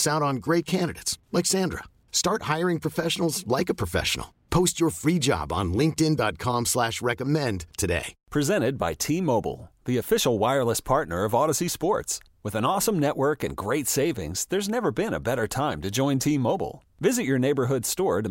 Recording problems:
abrupt cut into speech; at the start and the end

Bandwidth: 16 kHz